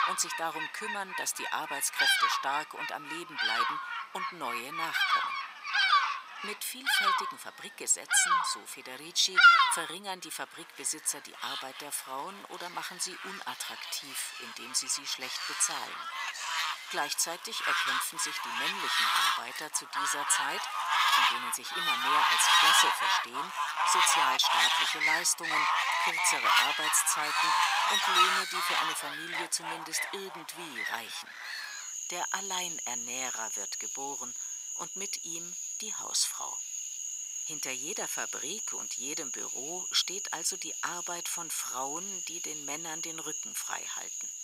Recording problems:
thin; very; fading below 800 Hz
animal sounds; very loud; throughout; 5 dB above the speech

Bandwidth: 15.5 kHz